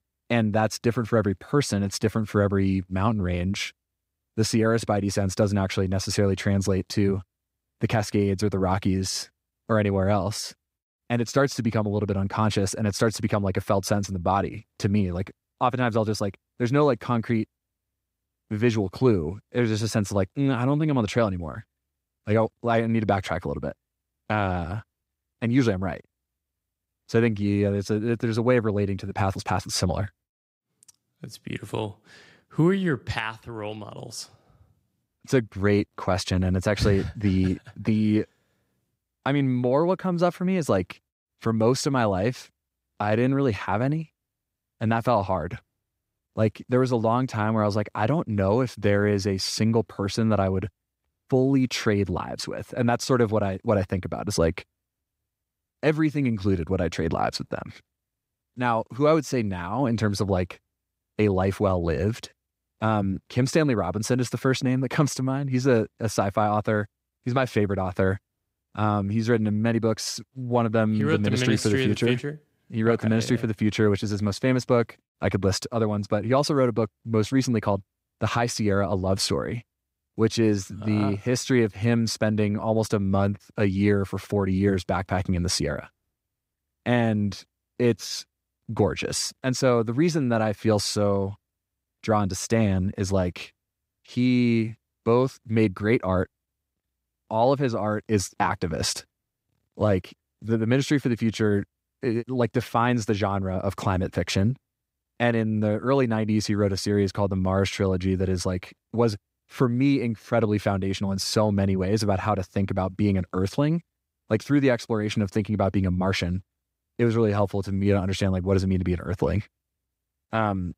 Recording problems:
none

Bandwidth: 15.5 kHz